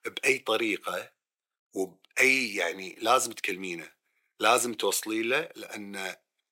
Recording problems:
thin; very; fading below 350 Hz

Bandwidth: 16 kHz